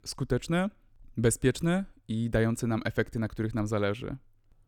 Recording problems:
none

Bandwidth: 18.5 kHz